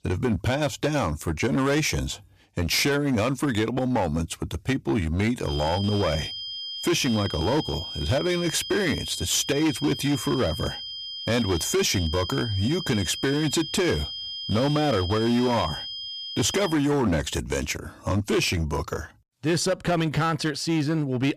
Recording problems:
distortion; slight; 10% of the sound clipped
high-pitched whine; loud; from 5.5 to 17 s; 3 kHz, 7 dB below the speech

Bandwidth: 14.5 kHz